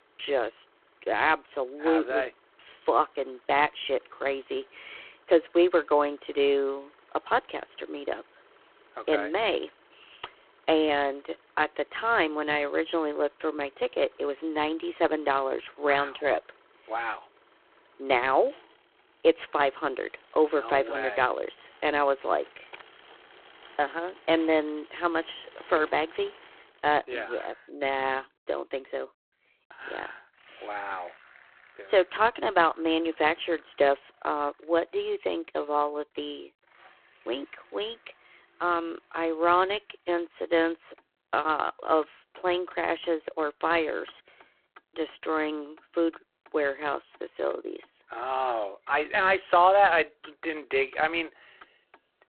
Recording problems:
phone-call audio; poor line
traffic noise; faint; throughout; 30 dB below the speech

